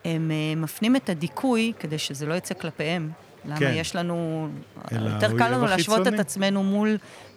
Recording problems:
murmuring crowd; faint; throughout; 25 dB below the speech

